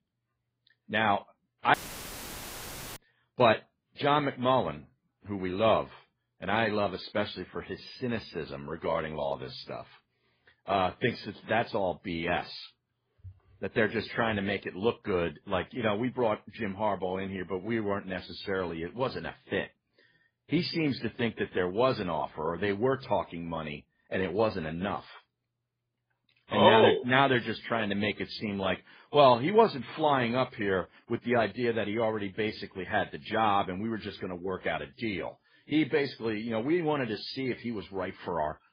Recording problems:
garbled, watery; badly; nothing above 5 kHz
audio cutting out; filled with static; at 1.5 s for 1 s

